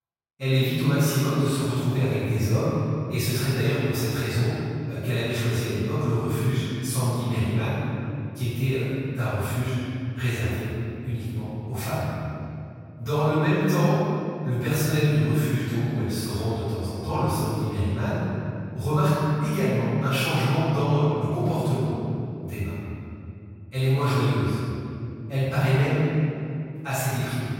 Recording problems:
room echo; strong; dies away in 2.6 s
off-mic speech; far

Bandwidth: 16 kHz